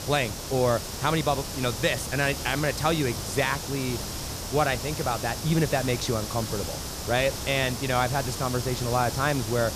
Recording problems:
hiss; loud; throughout; 6 dB below the speech

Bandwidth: 14.5 kHz